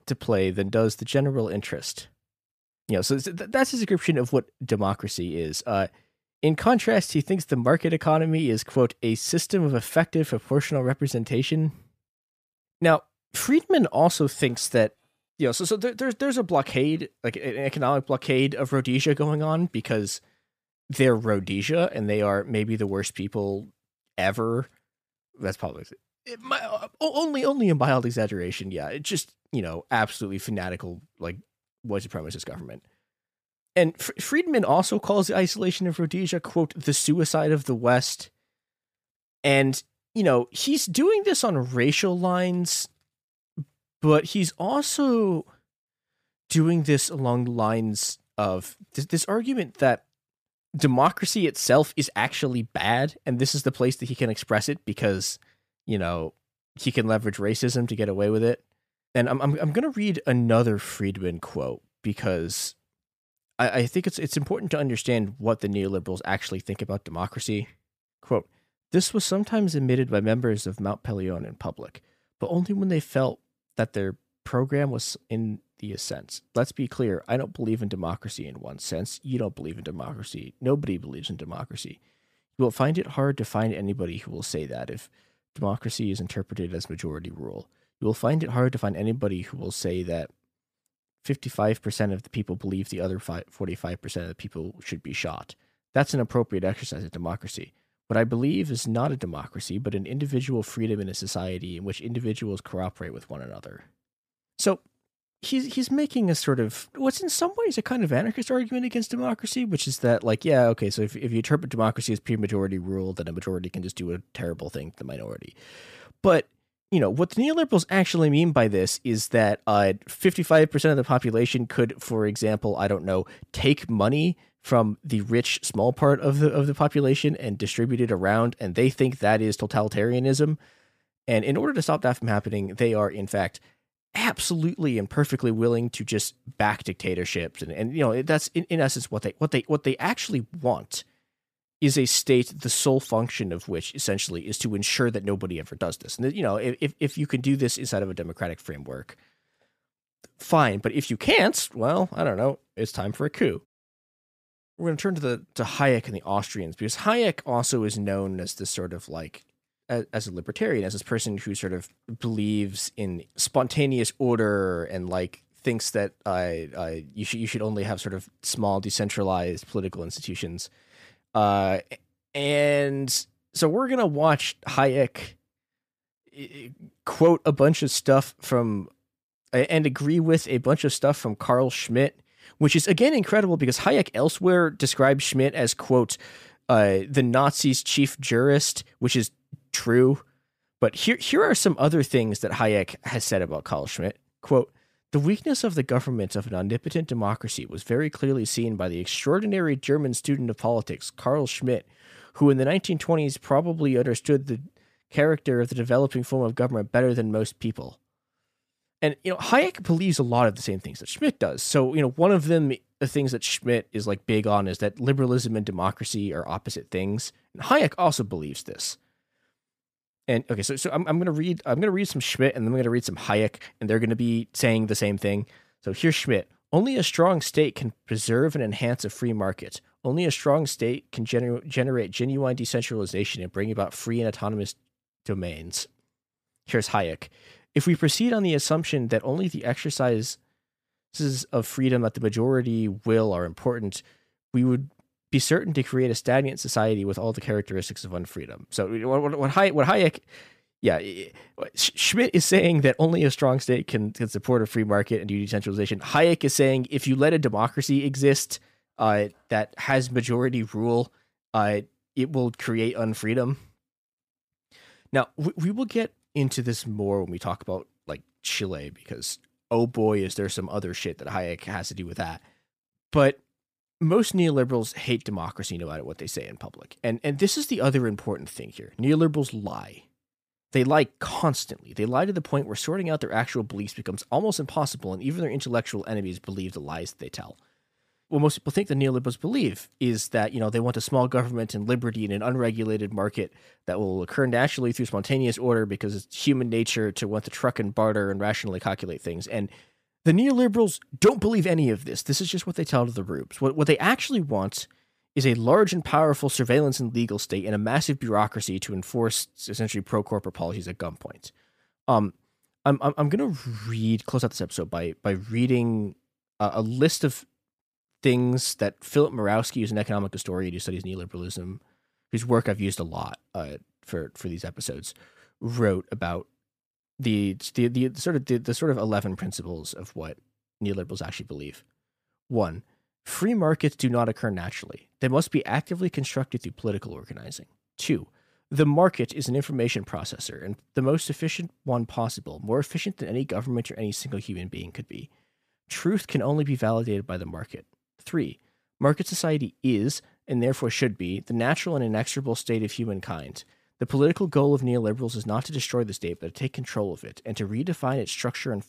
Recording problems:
none

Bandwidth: 15 kHz